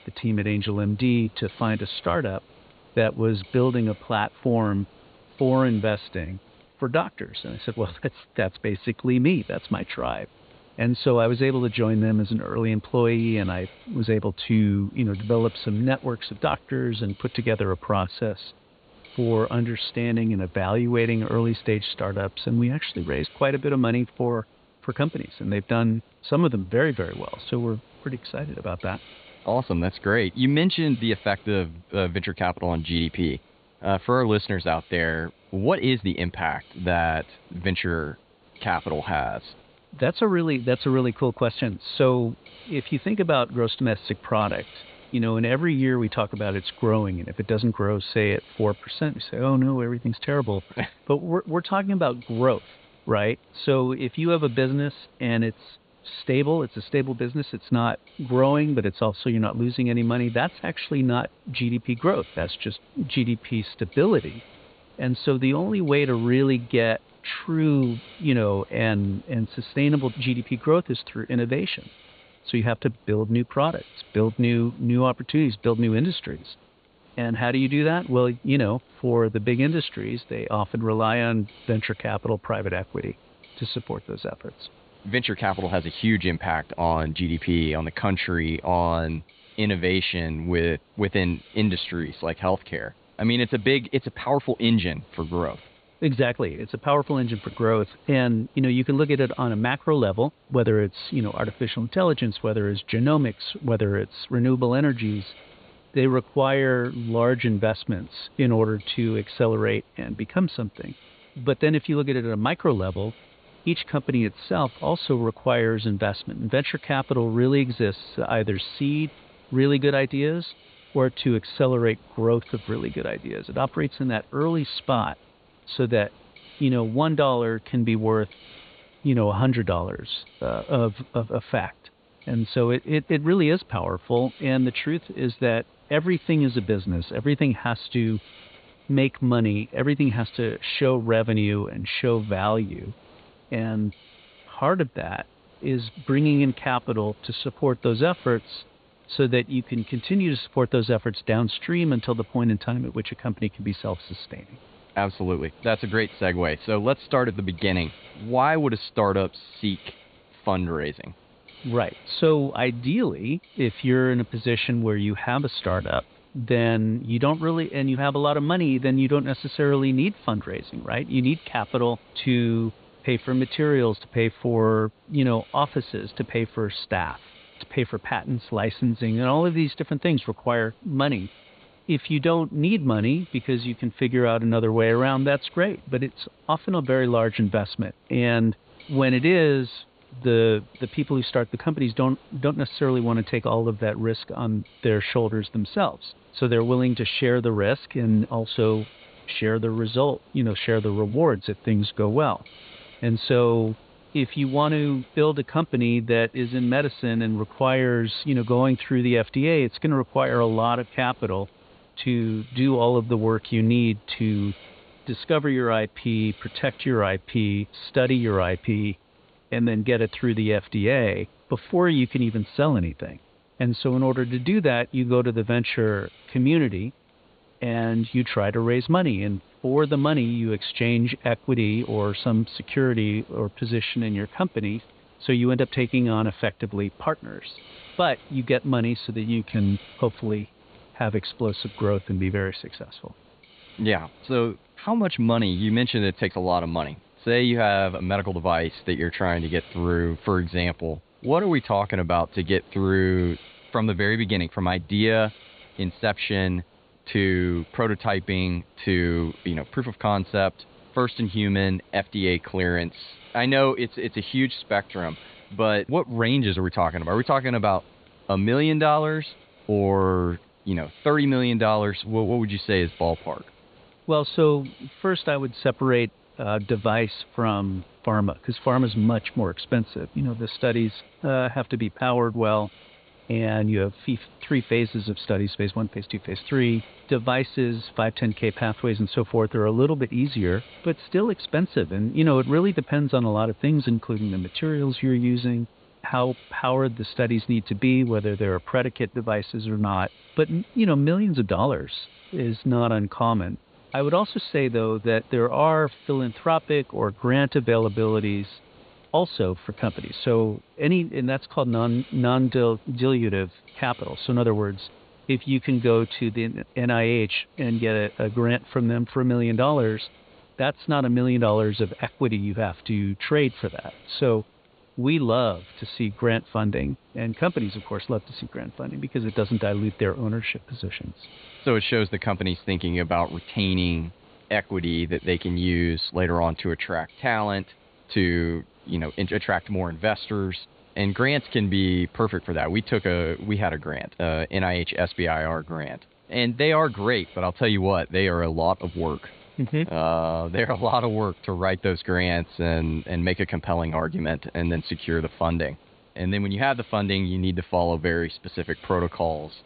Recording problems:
high frequencies cut off; severe; nothing above 4.5 kHz
hiss; faint; throughout; 25 dB below the speech

